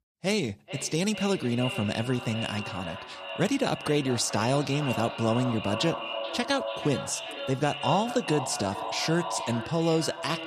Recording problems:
echo of what is said; strong; throughout; 430 ms later, 7 dB below the speech

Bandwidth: 15 kHz